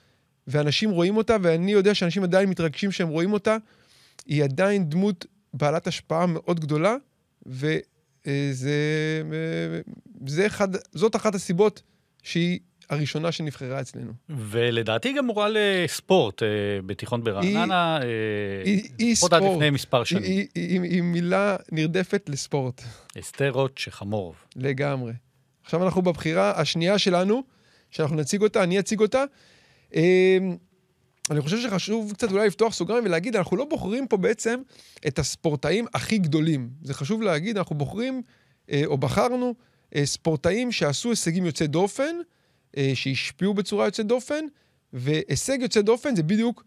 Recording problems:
none

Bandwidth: 14.5 kHz